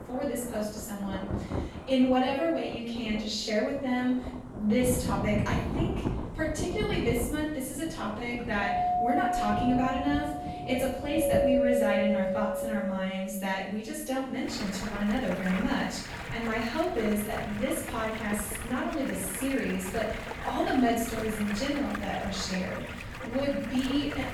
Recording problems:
off-mic speech; far
room echo; noticeable; dies away in 0.7 s
rain or running water; loud; throughout; 7 dB below the speech
doorbell; loud; from 8.5 to 13 s; peak 5 dB above the speech

